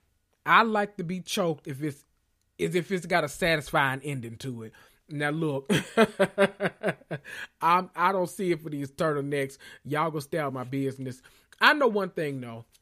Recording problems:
none

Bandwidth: 15 kHz